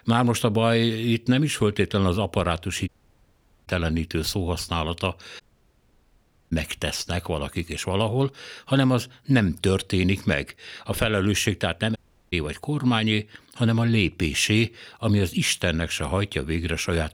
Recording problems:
audio cutting out; at 3 s for 1 s, at 5.5 s for 1 s and at 12 s

